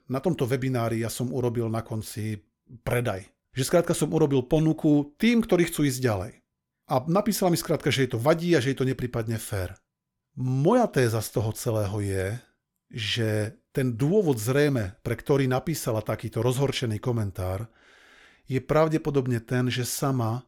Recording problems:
none

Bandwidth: 18 kHz